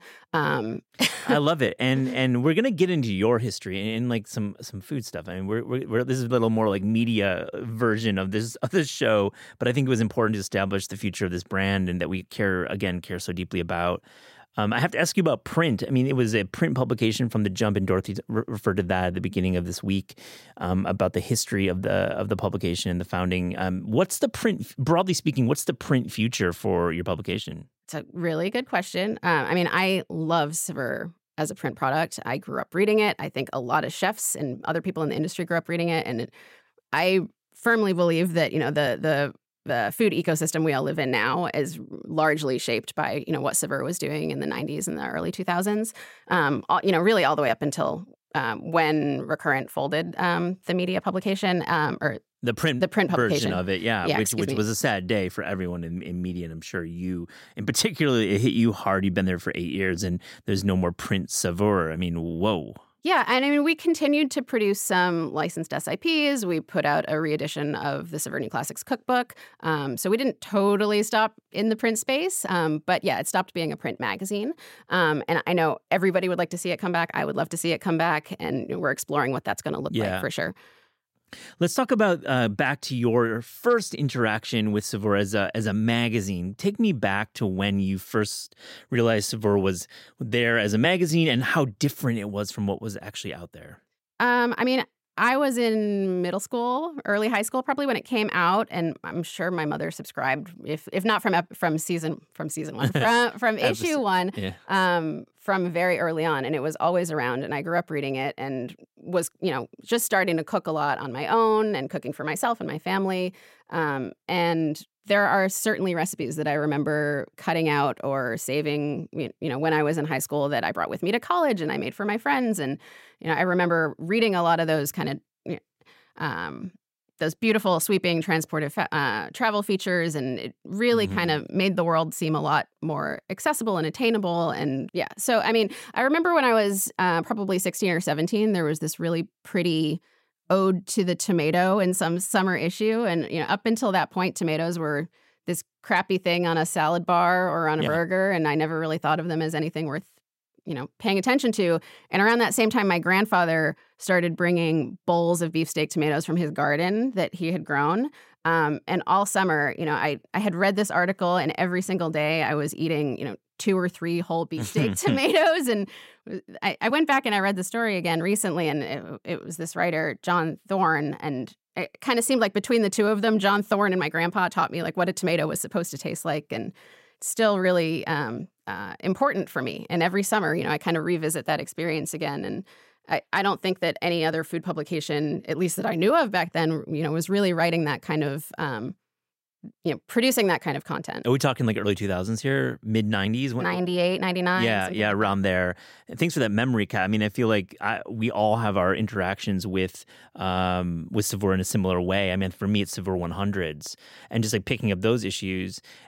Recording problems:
none

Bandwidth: 16 kHz